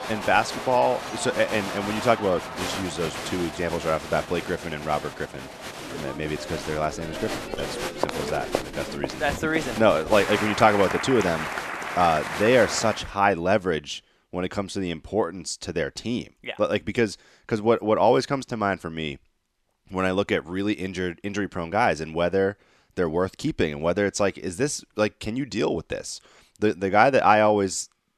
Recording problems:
crowd noise; loud; until 13 s; 7 dB below the speech

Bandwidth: 13.5 kHz